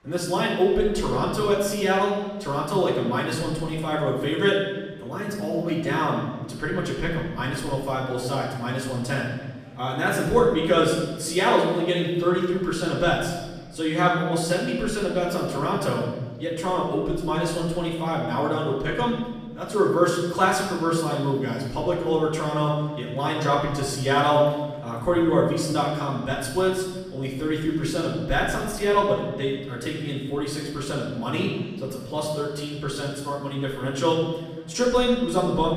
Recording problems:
off-mic speech; far
room echo; noticeable; dies away in 1.2 s
murmuring crowd; faint; throughout; 30 dB below the speech

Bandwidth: 14.5 kHz